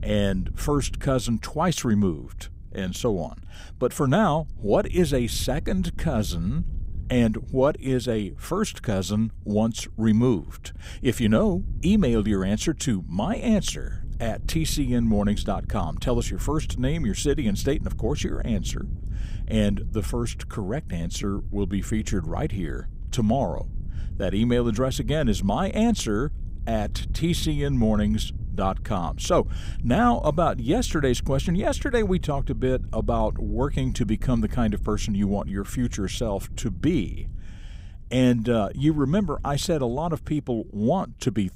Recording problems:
wind noise on the microphone; occasional gusts; 25 dB below the speech

